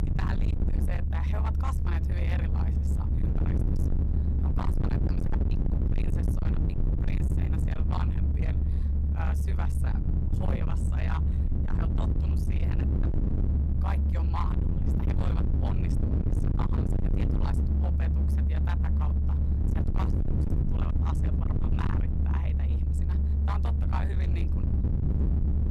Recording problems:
distortion; heavy; 52% of the sound clipped
low rumble; very loud; throughout; as loud as the speech

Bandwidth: 14.5 kHz